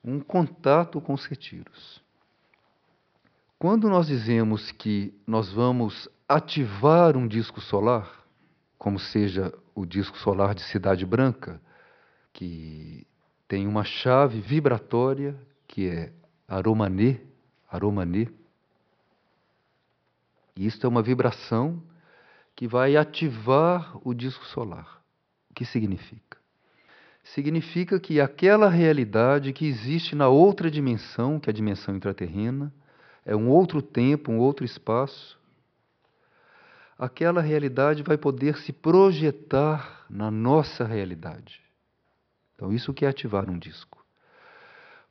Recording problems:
high frequencies cut off; noticeable; nothing above 5.5 kHz

